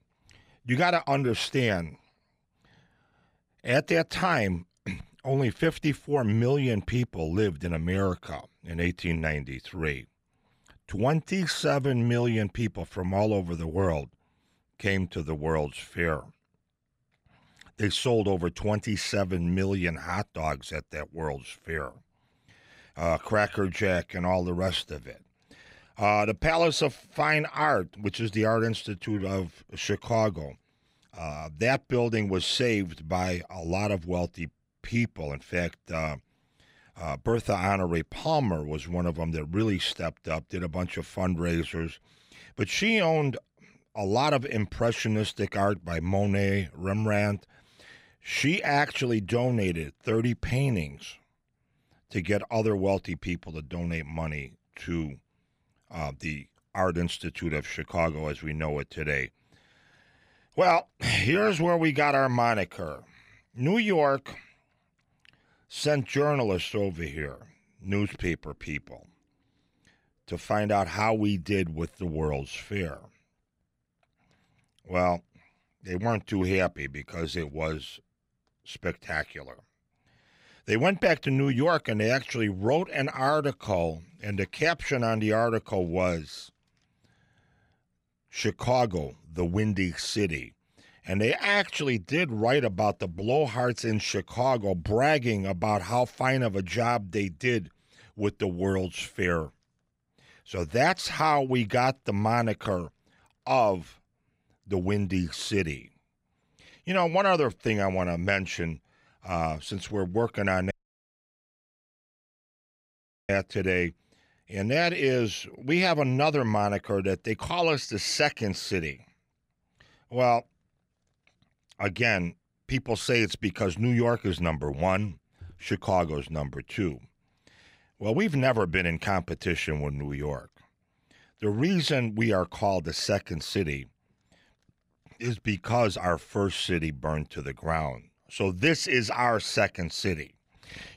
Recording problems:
audio cutting out; at 1:51 for 2.5 s

